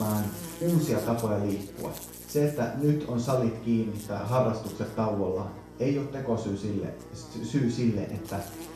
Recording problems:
off-mic speech; far
room echo; noticeable; dies away in 0.6 s
electrical hum; noticeable; throughout; 60 Hz, 15 dB below the speech
abrupt cut into speech; at the start

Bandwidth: 13.5 kHz